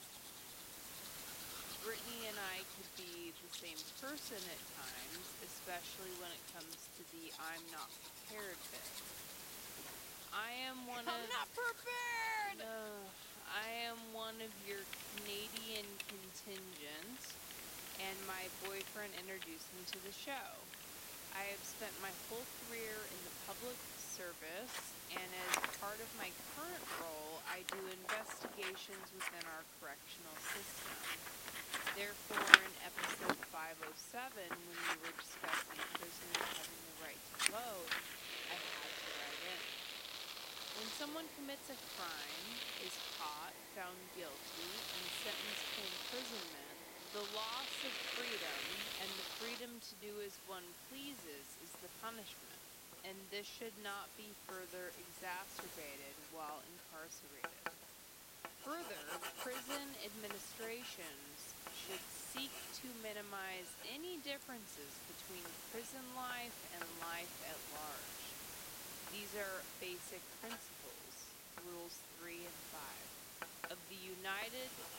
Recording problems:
wrong speed, natural pitch; too slow; 0.6 times normal speed
thin; very slightly; fading below 250 Hz
household noises; very loud; throughout; 6 dB above the speech
hiss; loud; throughout; 2 dB below the speech

